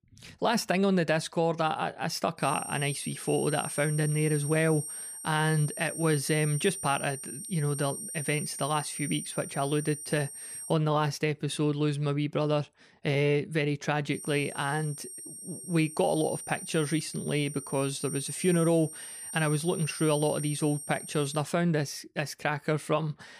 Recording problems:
high-pitched whine; loud; from 2.5 to 11 s and from 14 to 21 s; 8.5 kHz, 8 dB below the speech

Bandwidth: 15 kHz